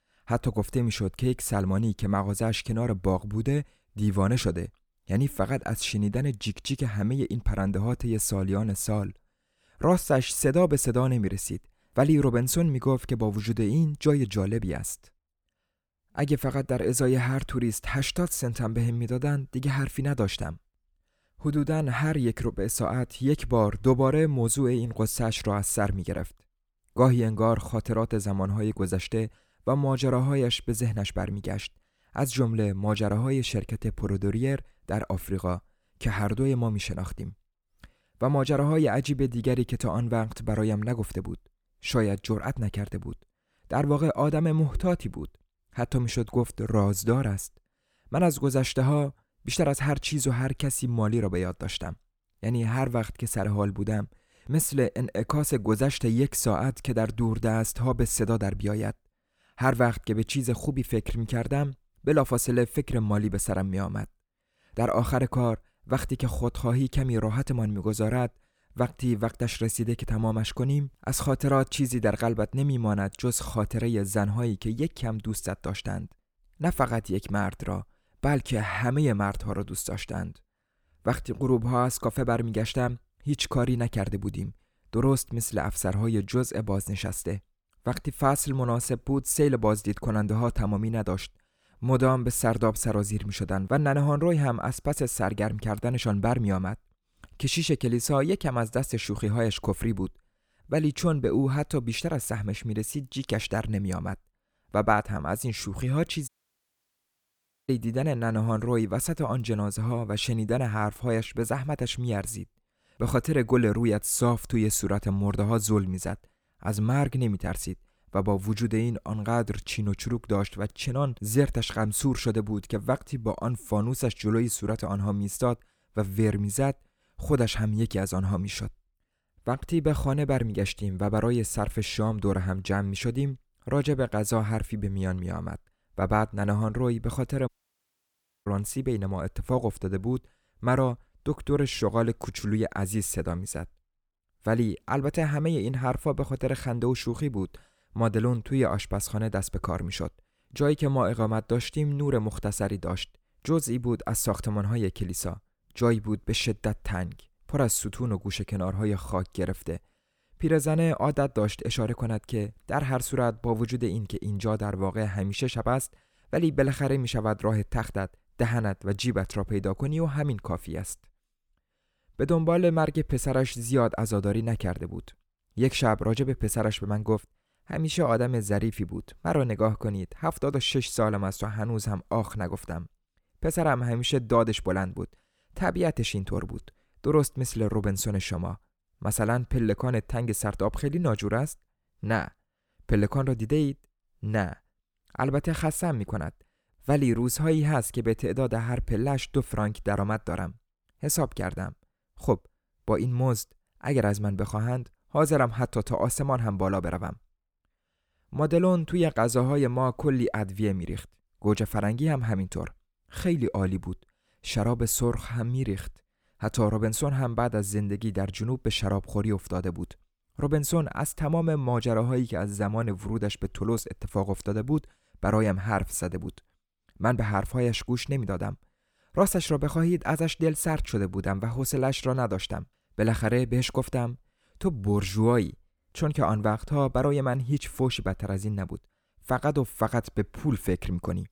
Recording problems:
audio cutting out; at 1:46 for 1.5 s and at 2:17 for 1 s

